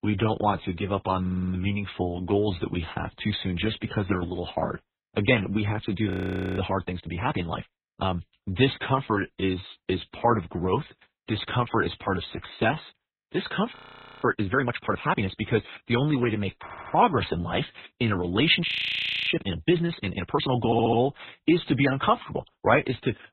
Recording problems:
garbled, watery; badly; nothing above 4 kHz
audio stuttering; at 1 s, at 17 s and at 21 s
audio freezing; at 6 s, at 14 s and at 19 s for 0.5 s

